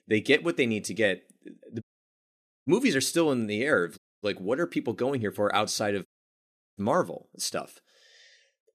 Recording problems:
audio cutting out; at 2 s for 1 s, at 4 s and at 6 s for 0.5 s

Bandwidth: 14 kHz